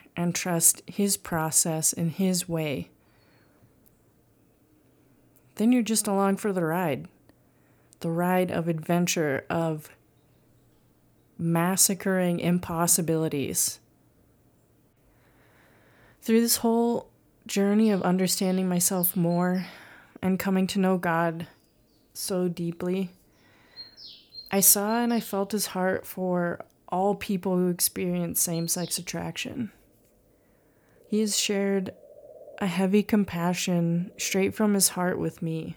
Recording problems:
animal sounds; faint; throughout; 25 dB below the speech

